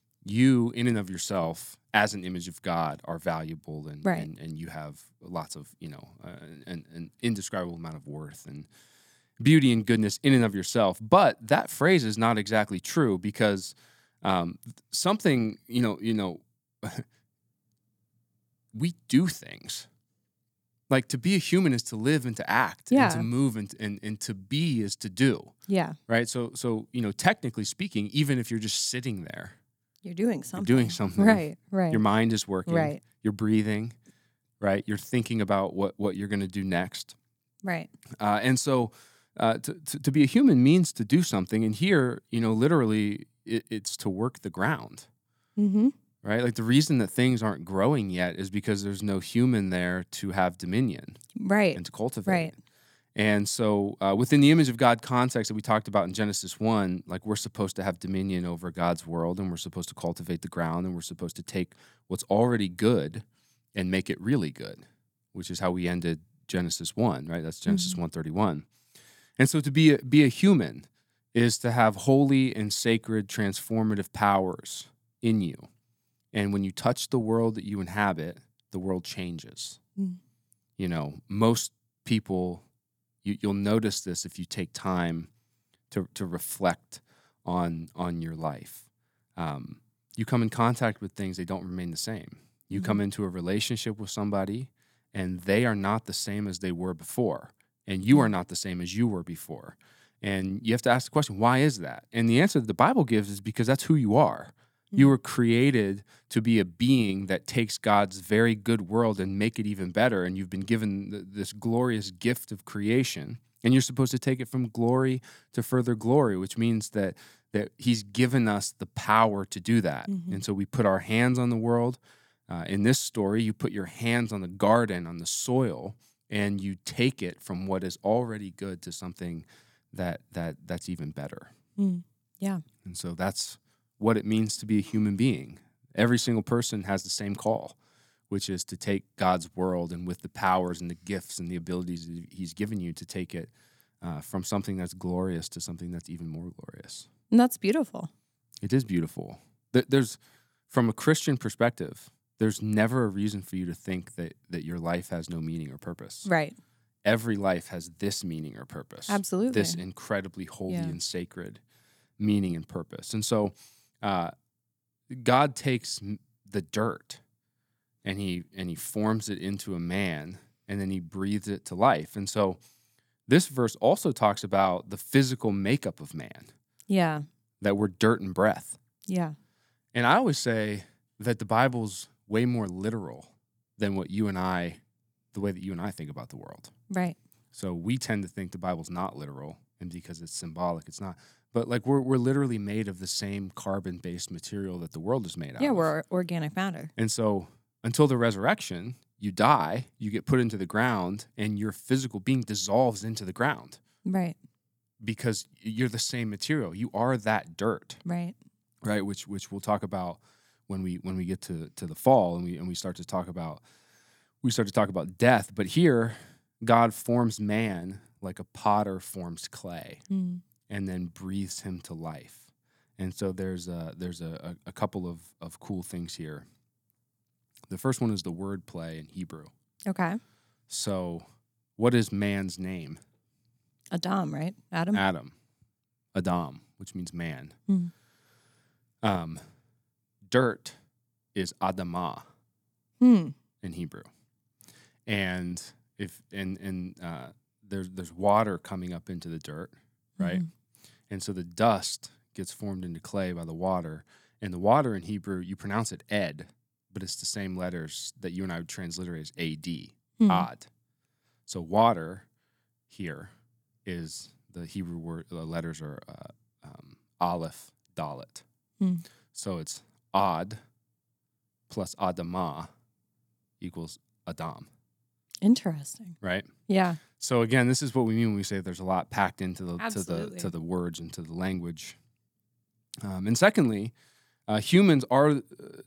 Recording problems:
none

